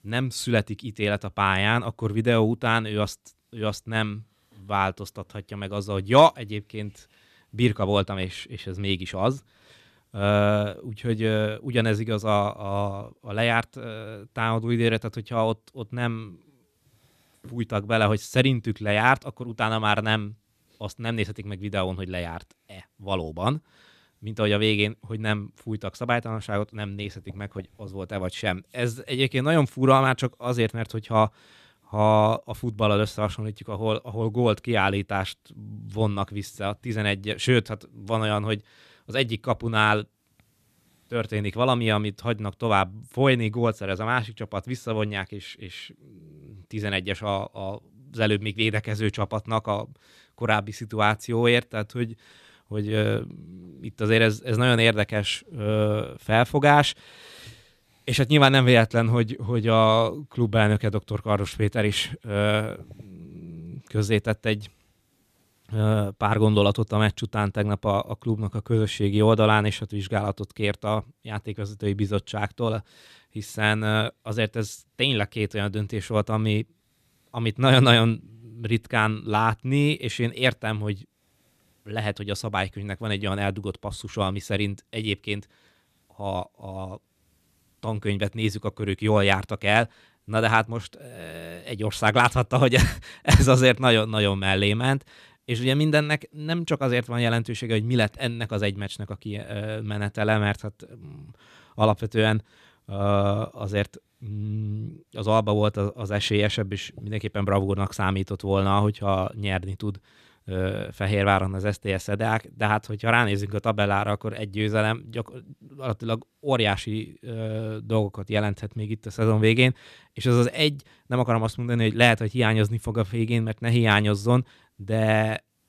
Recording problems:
none

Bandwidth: 14.5 kHz